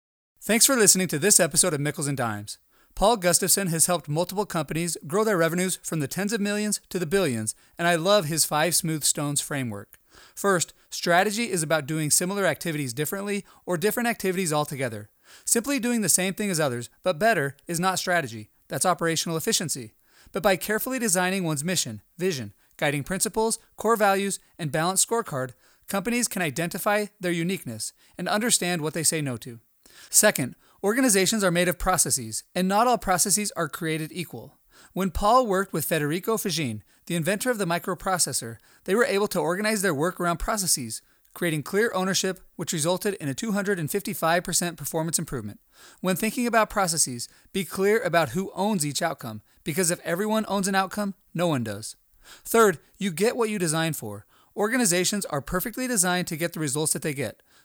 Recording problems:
none

